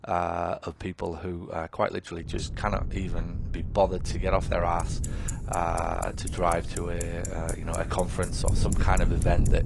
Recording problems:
garbled, watery; slightly; nothing above 10 kHz
traffic noise; noticeable; throughout; 10 dB below the speech
wind noise on the microphone; occasional gusts; from 2 s on; 15 dB below the speech

